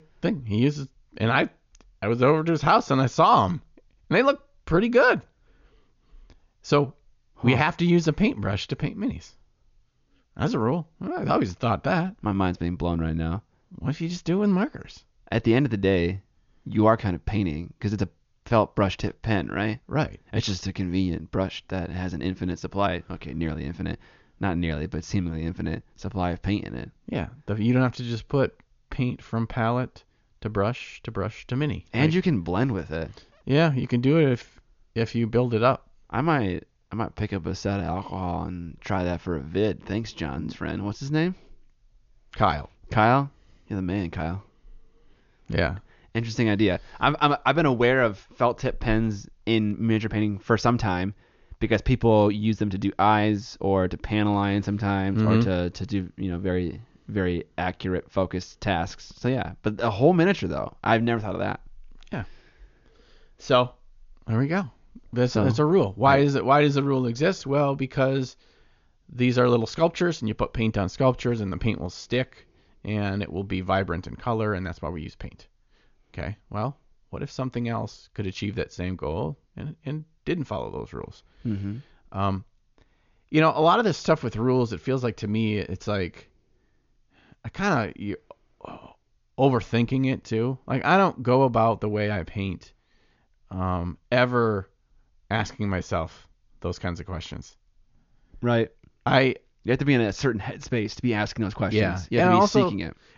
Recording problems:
high frequencies cut off; noticeable; nothing above 7 kHz

